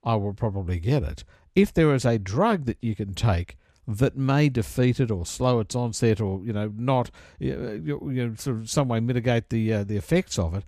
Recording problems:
none

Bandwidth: 14.5 kHz